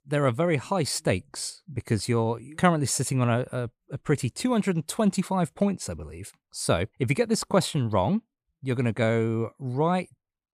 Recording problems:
none

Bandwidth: 15 kHz